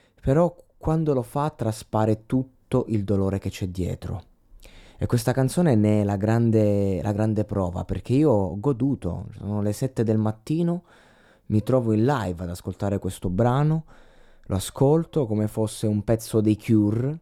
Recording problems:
muffled; slightly; fading above 1.5 kHz

